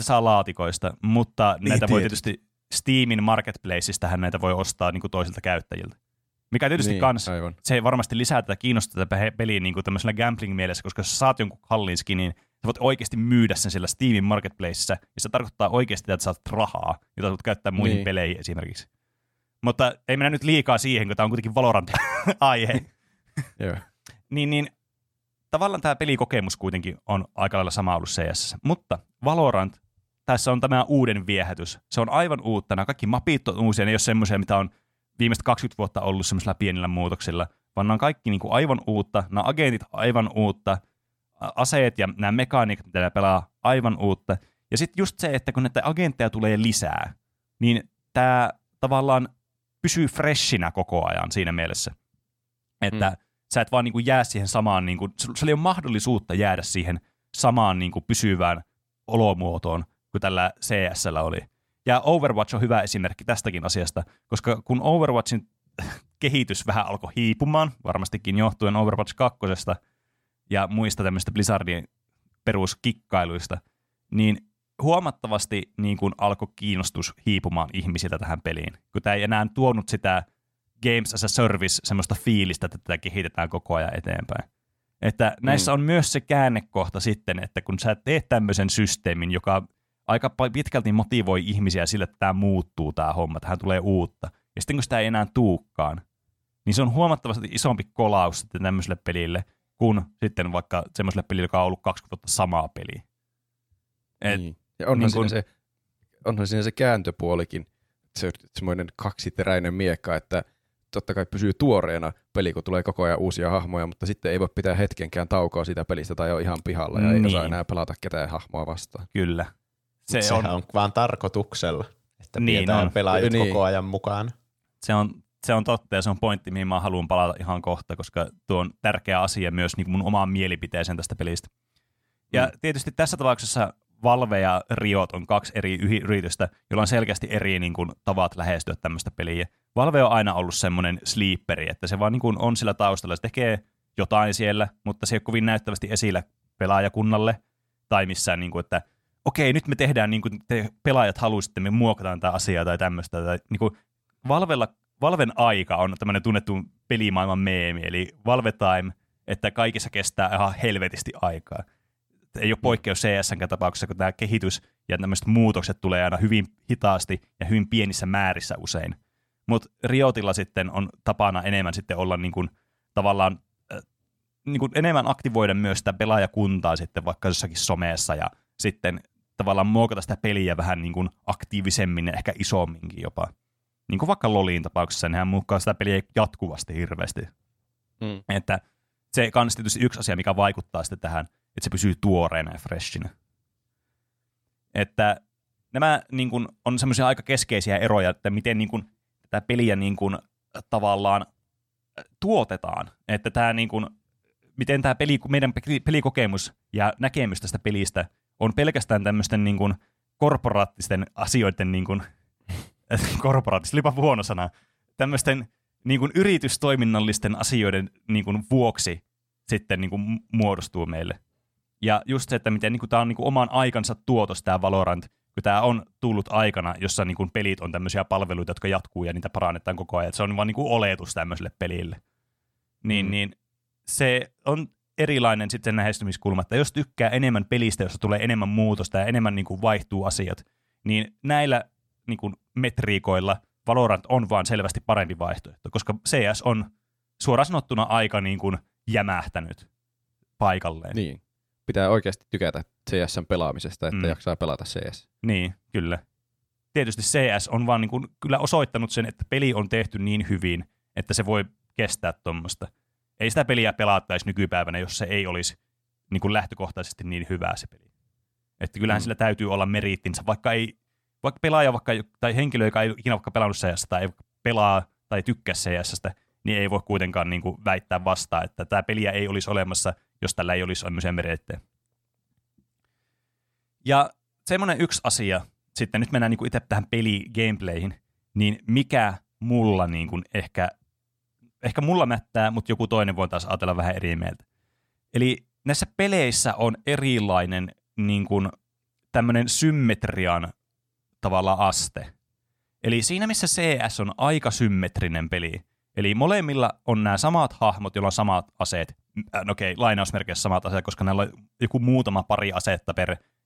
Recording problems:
abrupt cut into speech; at the start

